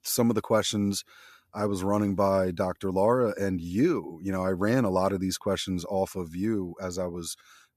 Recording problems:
none

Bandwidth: 14.5 kHz